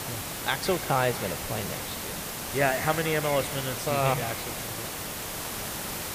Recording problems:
echo of what is said; noticeable; throughout; 160 ms later, 15 dB below the speech
hiss; loud; throughout; 4 dB below the speech

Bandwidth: 15 kHz